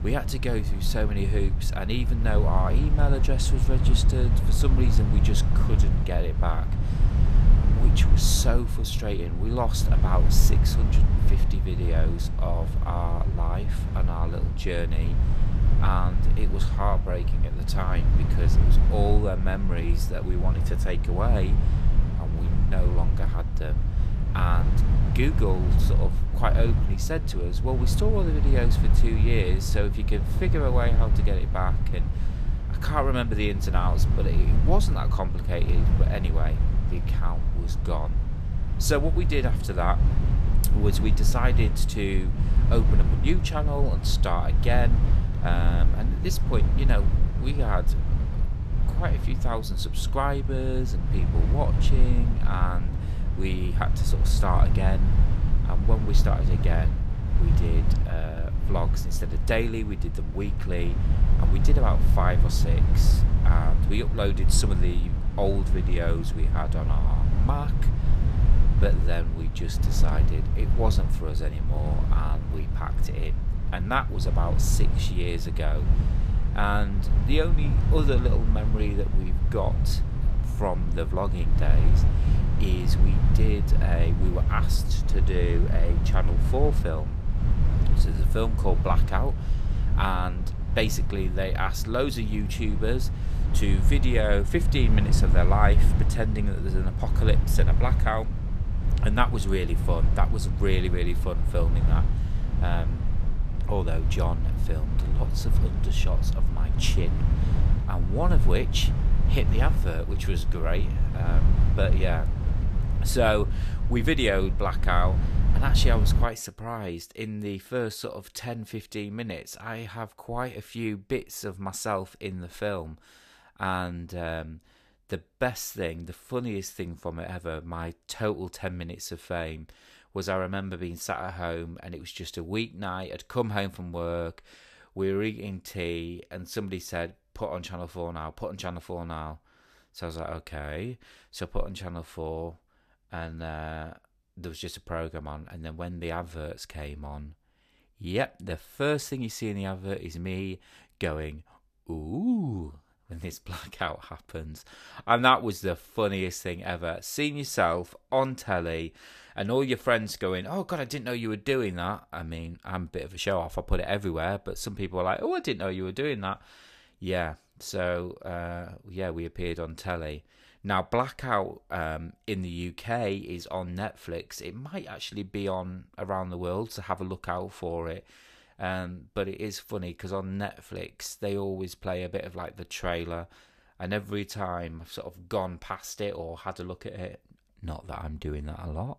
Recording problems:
low rumble; loud; until 1:56; 8 dB below the speech

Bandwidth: 14.5 kHz